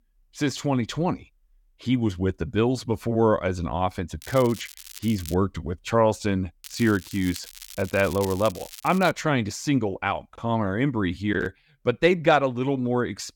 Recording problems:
crackling; noticeable; from 4 to 5.5 s and from 6.5 to 9 s; 15 dB below the speech

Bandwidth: 18 kHz